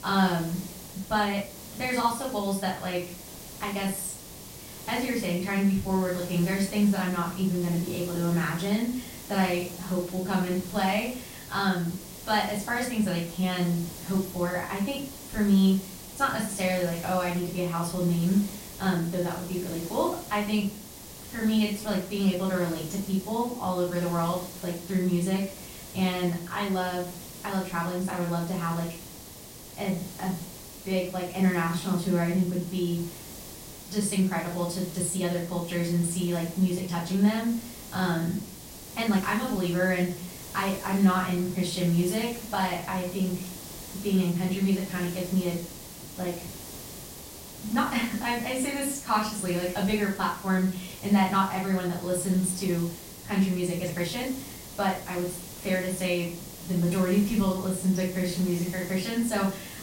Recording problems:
off-mic speech; far
room echo; noticeable; dies away in 0.4 s
hiss; noticeable; throughout; 15 dB below the speech
uneven, jittery; strongly; from 1 to 59 s

